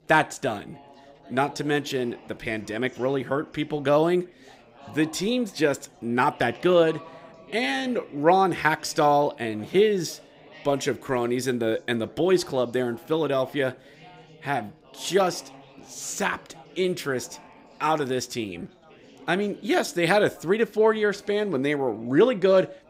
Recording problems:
chatter from many people; faint; throughout; 25 dB below the speech

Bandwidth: 15.5 kHz